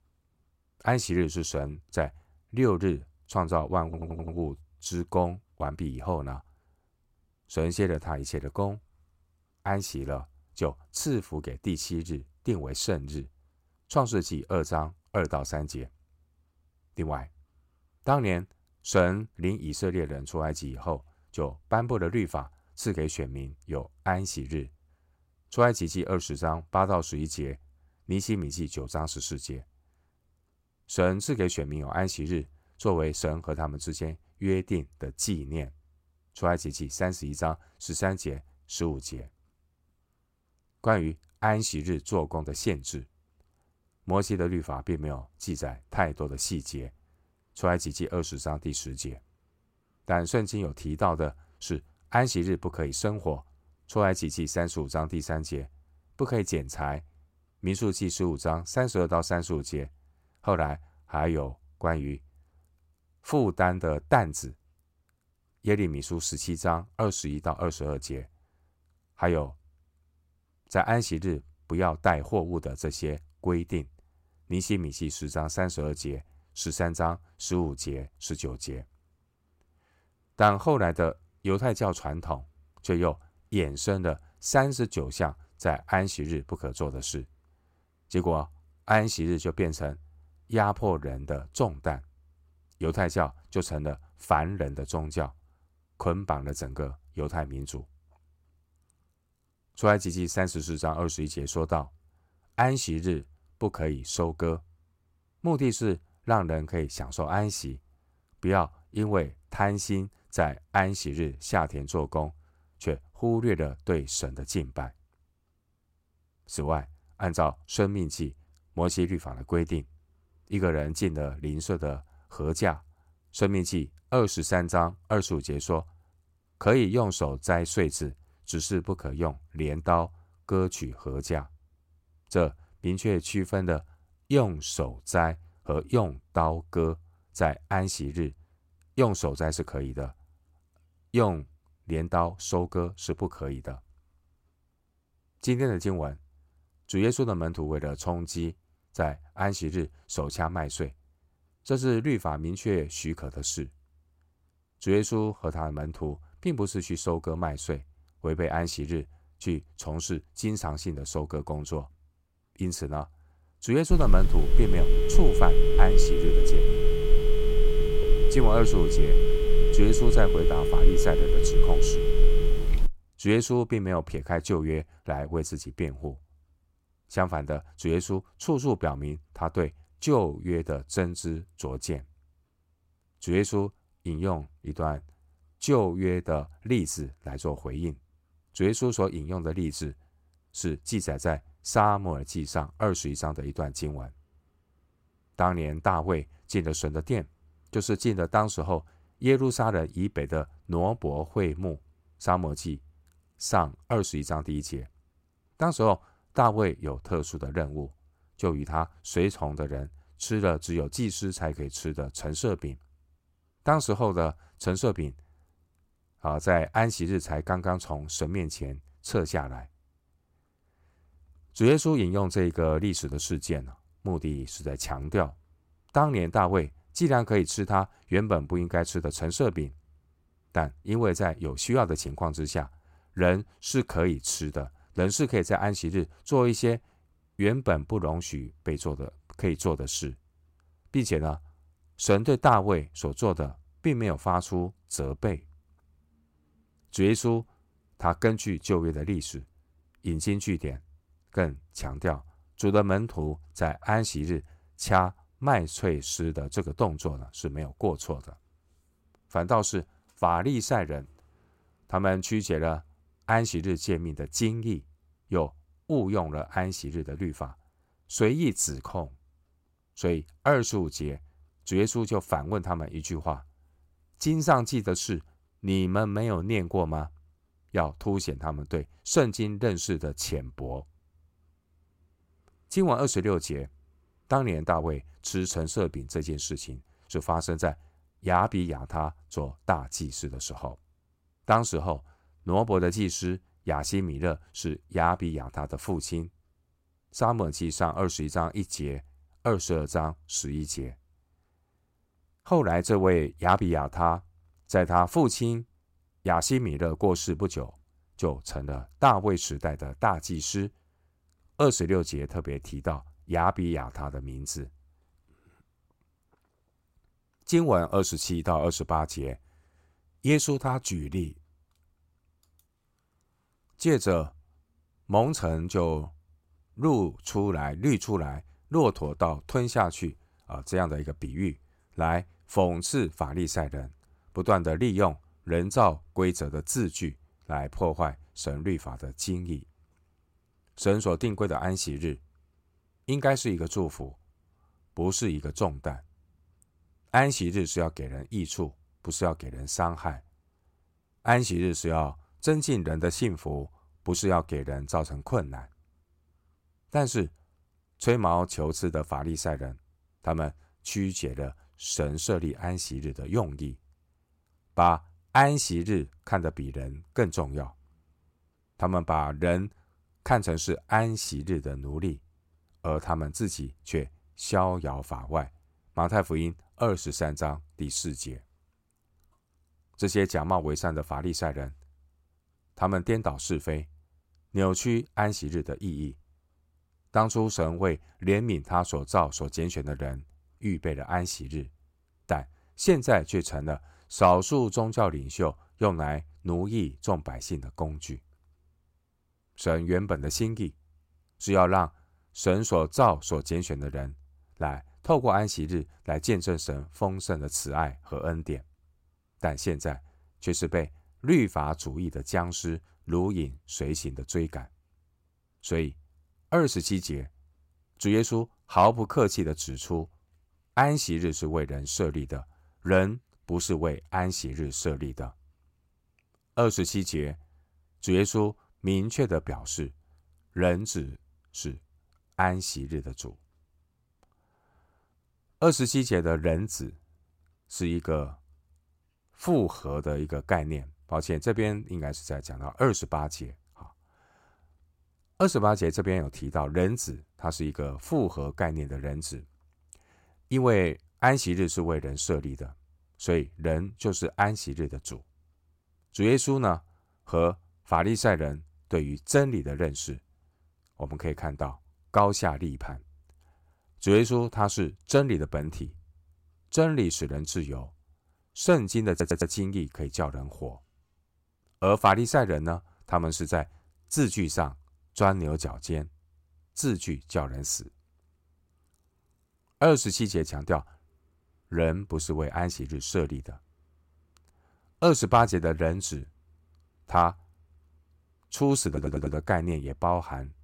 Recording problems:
audio stuttering; at 4 s, at 7:49 and at 8:09
phone ringing; loud; from 2:44 to 2:53; peak 5 dB above the speech

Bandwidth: 16 kHz